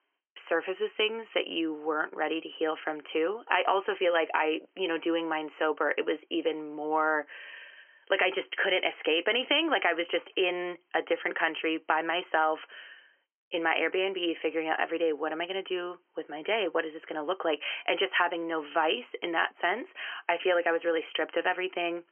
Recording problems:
thin; very; fading below 300 Hz
high frequencies cut off; severe; nothing above 3 kHz

